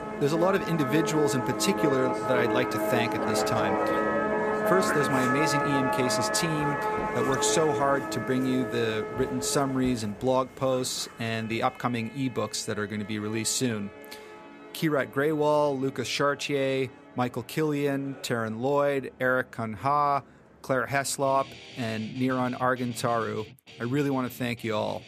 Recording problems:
background music; loud; throughout; 1 dB below the speech

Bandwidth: 15 kHz